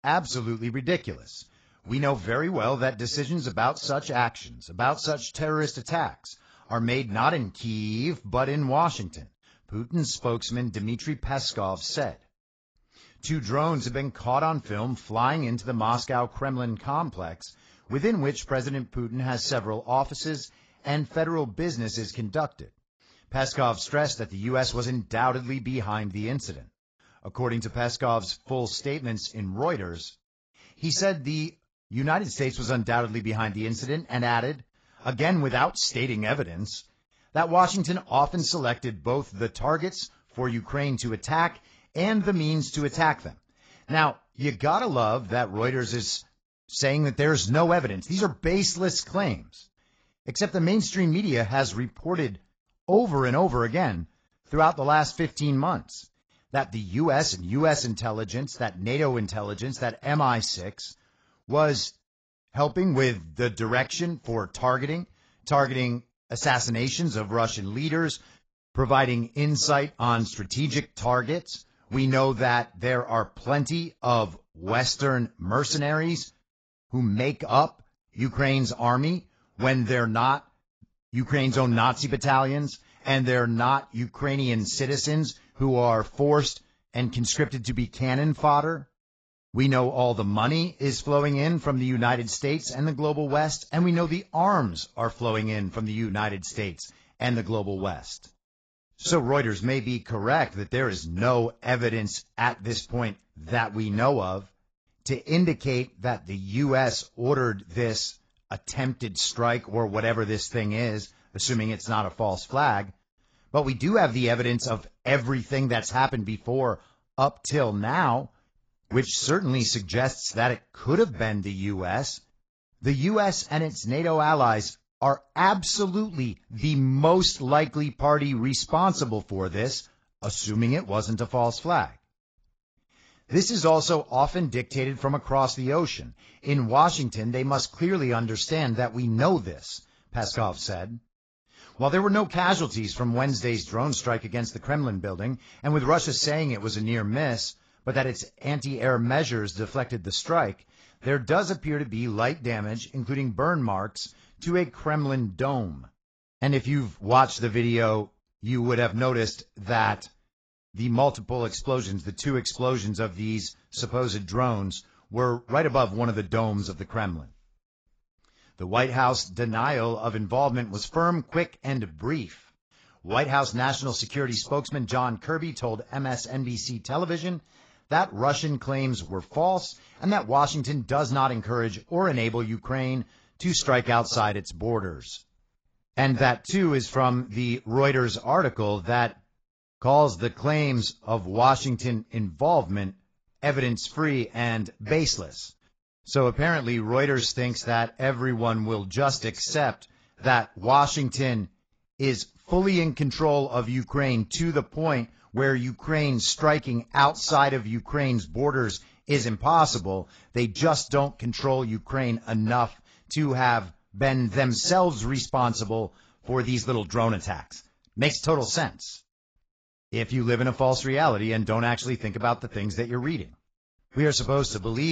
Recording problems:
garbled, watery; badly; nothing above 7.5 kHz
abrupt cut into speech; at the end

